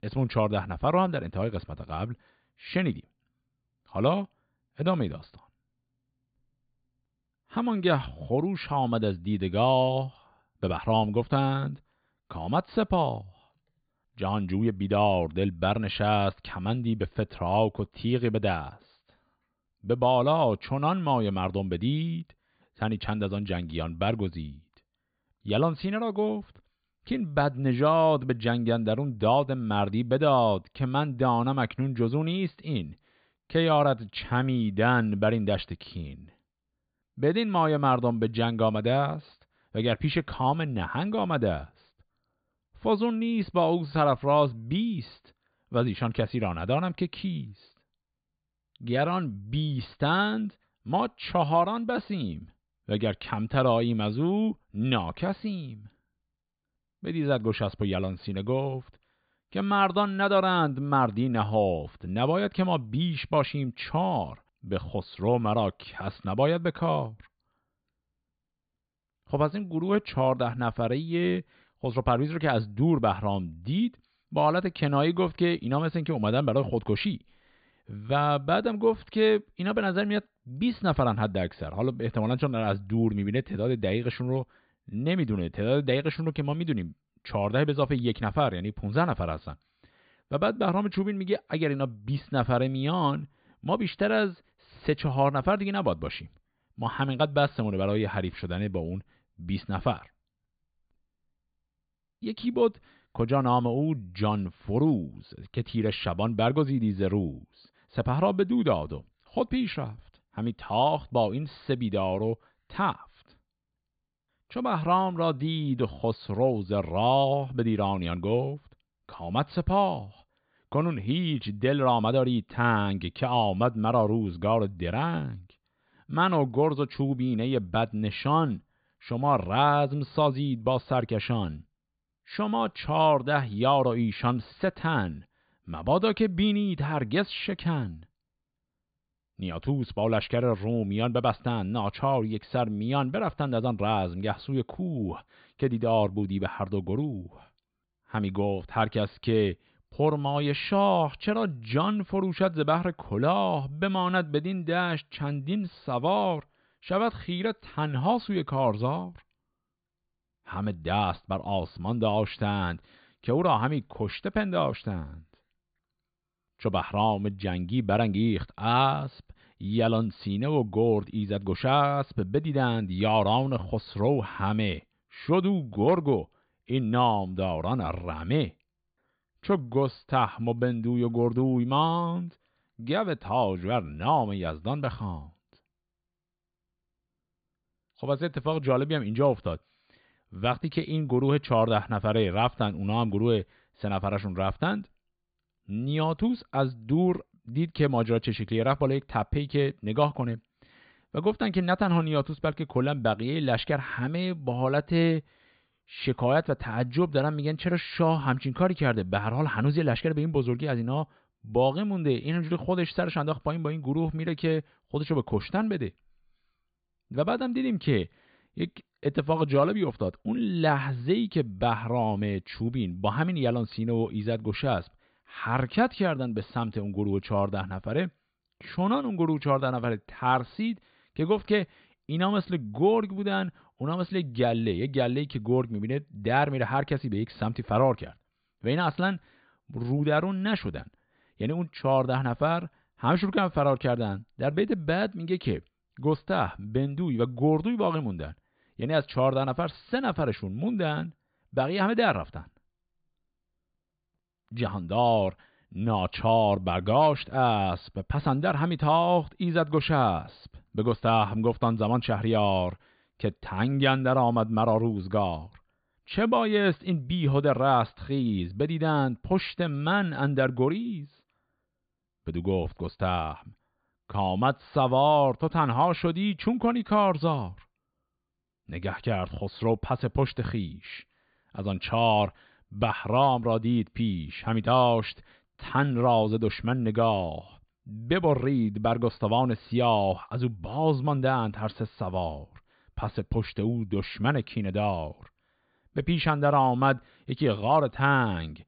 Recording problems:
high frequencies cut off; severe; nothing above 4.5 kHz

